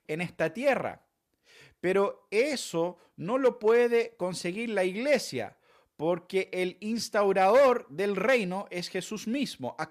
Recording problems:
none

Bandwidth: 14.5 kHz